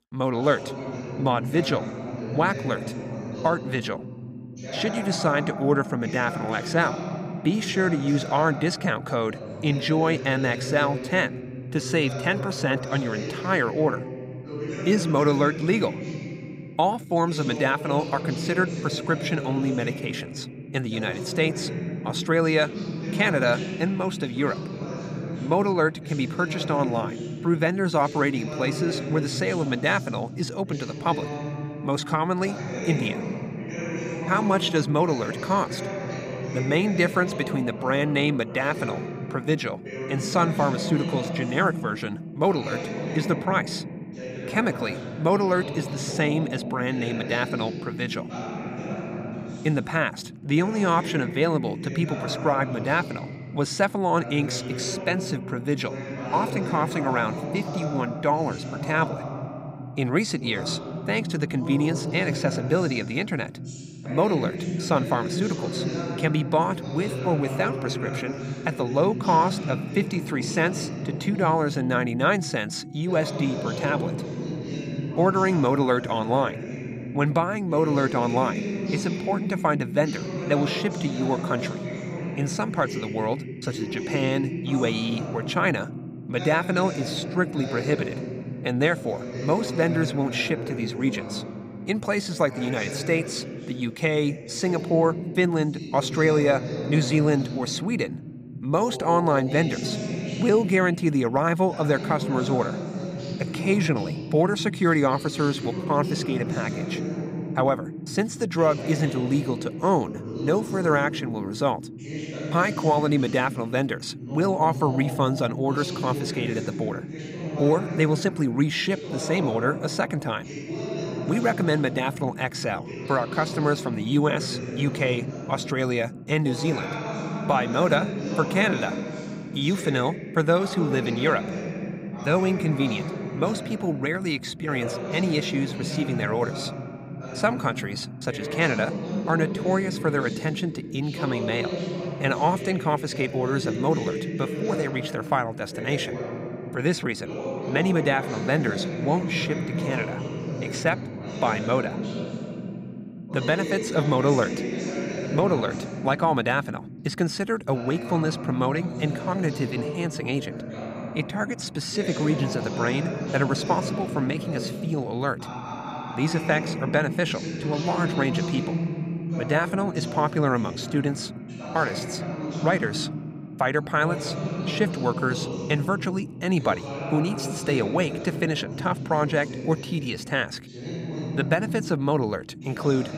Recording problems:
voice in the background; loud; throughout; 7 dB below the speech

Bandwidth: 15.5 kHz